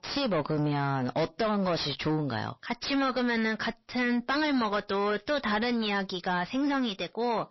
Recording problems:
distortion; heavy; 5 dB below the speech
garbled, watery; slightly; nothing above 5.5 kHz

